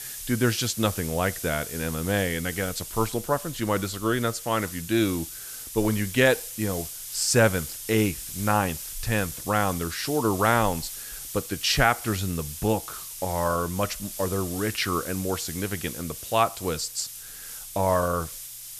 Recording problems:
hiss; loud; throughout; 9 dB below the speech

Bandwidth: 14 kHz